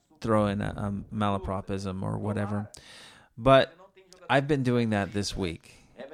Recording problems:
voice in the background; faint; throughout; 25 dB below the speech

